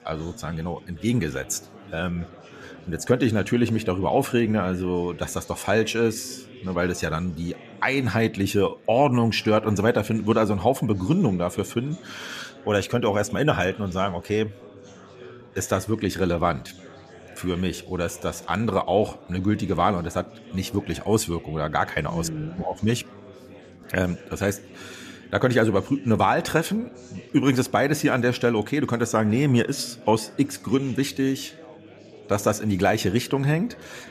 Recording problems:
chatter from many people; faint; throughout; 20 dB below the speech

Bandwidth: 14.5 kHz